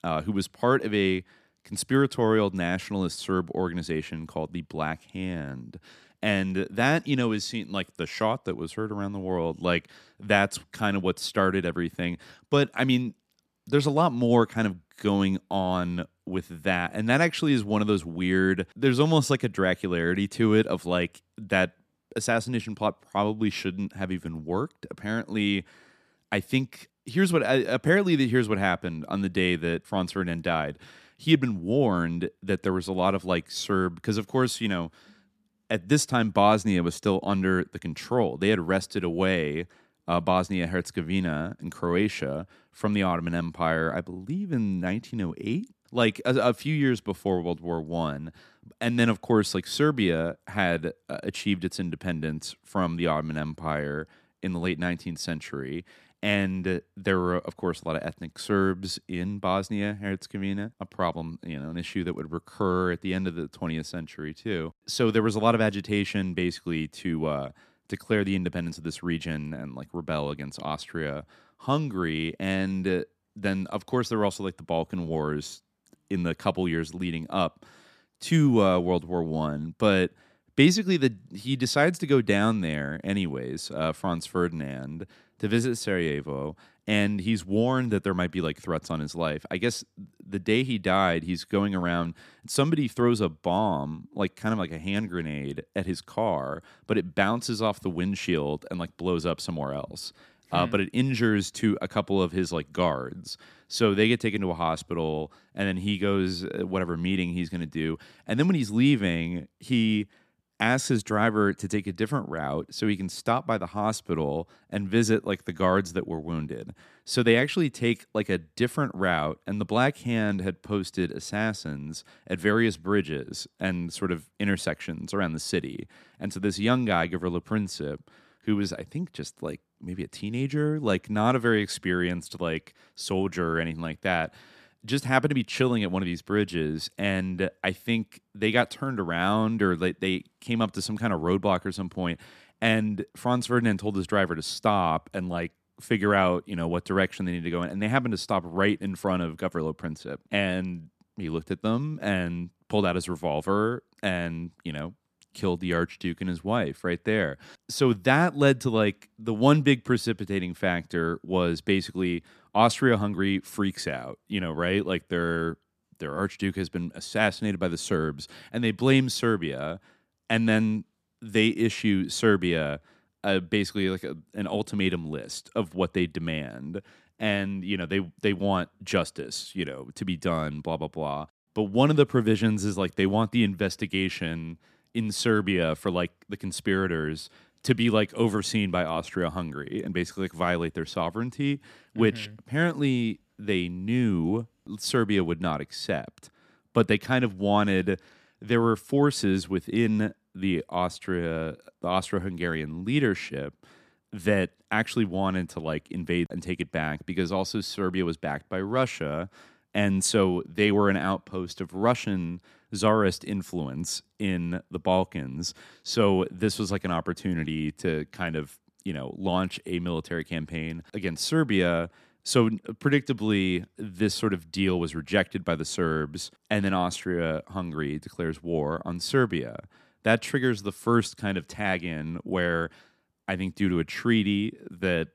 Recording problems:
none

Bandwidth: 14.5 kHz